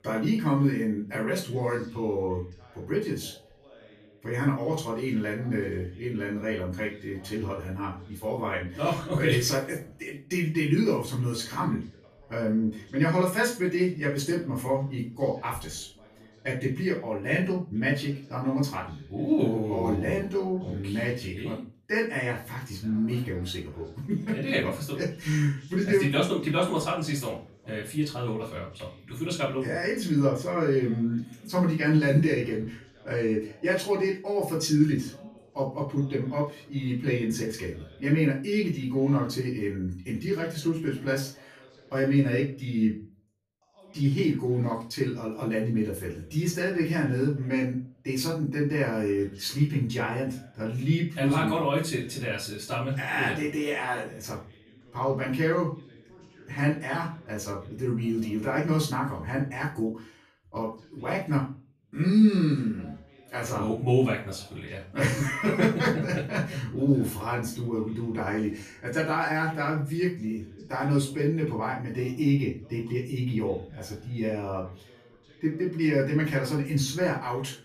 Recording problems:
off-mic speech; far
room echo; slight; dies away in 0.3 s
voice in the background; faint; throughout; 25 dB below the speech

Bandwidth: 14.5 kHz